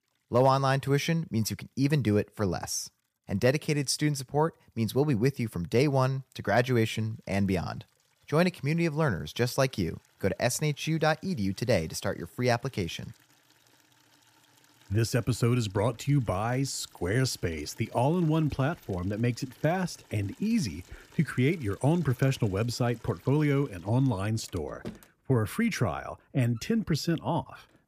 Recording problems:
household noises; faint; throughout; 25 dB below the speech

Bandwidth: 15 kHz